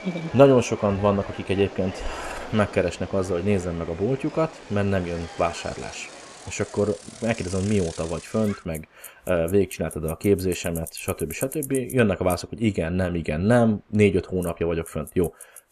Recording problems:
traffic noise; noticeable; throughout; 15 dB below the speech
train or aircraft noise; noticeable; throughout; 15 dB below the speech

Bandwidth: 14.5 kHz